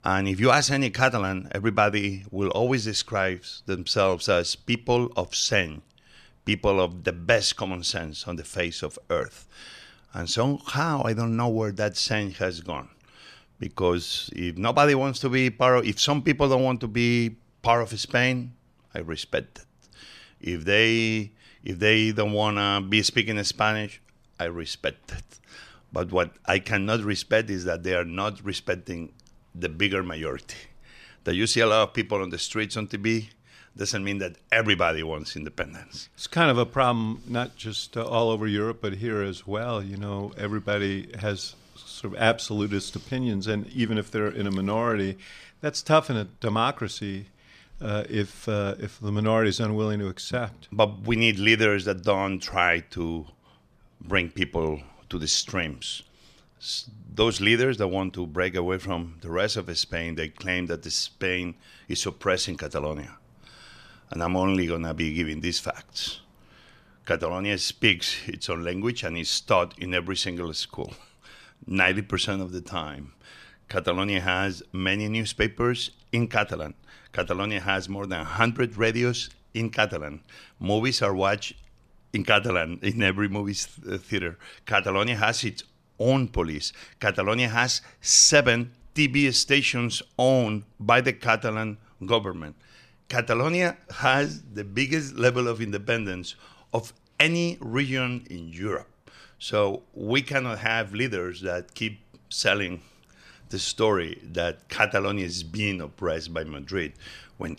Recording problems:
none

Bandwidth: 14 kHz